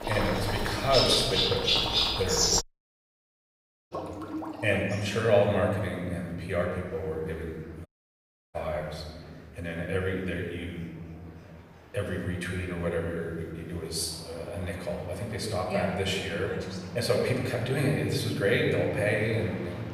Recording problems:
off-mic speech; far
room echo; noticeable; dies away in 1.8 s
animal sounds; very loud; throughout; 4 dB above the speech
household noises; loud; until 4.5 s; 6 dB below the speech
murmuring crowd; faint; throughout; 20 dB below the speech
audio cutting out; at 2.5 s for 1.5 s and at 8 s for 0.5 s

